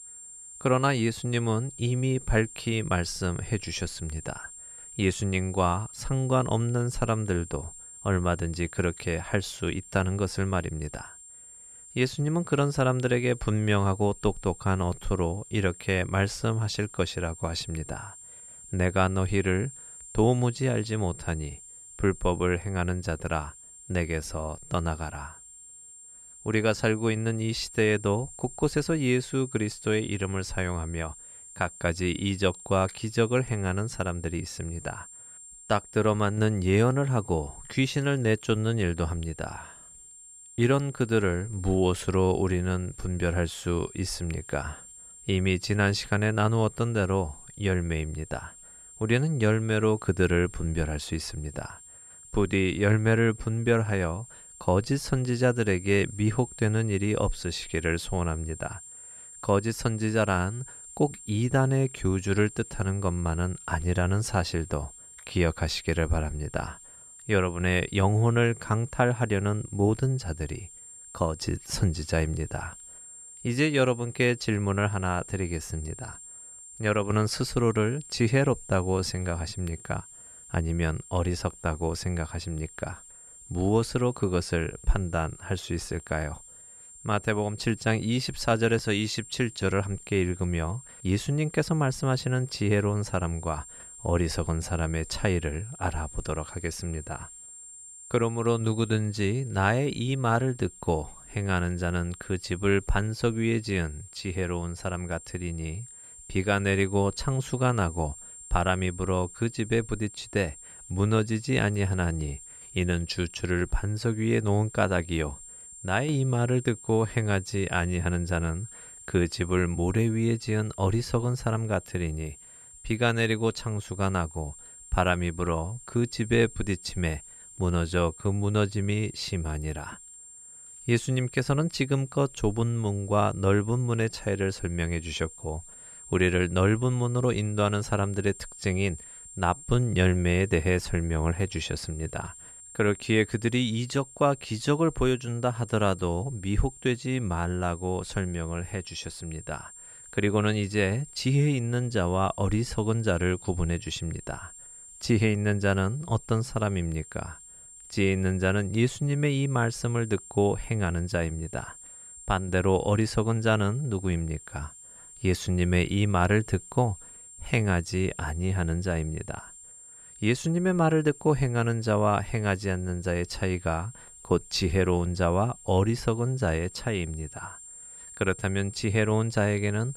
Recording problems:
high-pitched whine; noticeable; throughout; 7.5 kHz, 15 dB below the speech

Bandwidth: 14.5 kHz